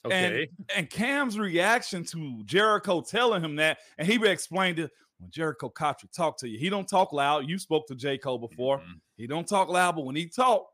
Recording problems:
none

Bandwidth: 15 kHz